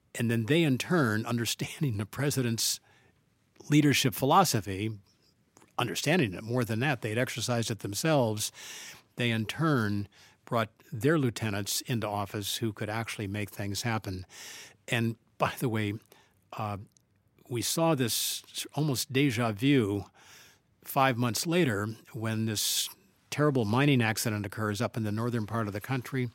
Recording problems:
none

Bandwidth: 16 kHz